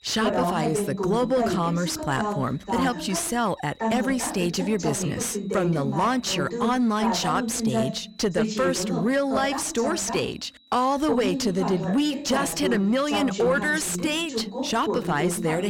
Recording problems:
distortion; slight; 10 dB below the speech
voice in the background; loud; throughout; 4 dB below the speech
high-pitched whine; faint; throughout; 4 kHz, 30 dB below the speech
abrupt cut into speech; at the end

